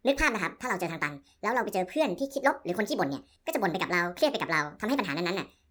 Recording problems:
wrong speed and pitch; too fast and too high; 1.7 times normal speed

